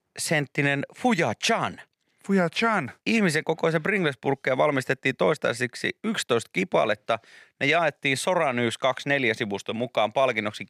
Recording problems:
none

